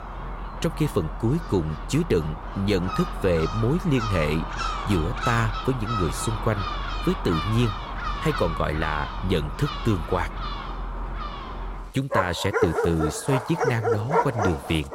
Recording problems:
animal sounds; loud; throughout; 4 dB below the speech

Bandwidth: 16 kHz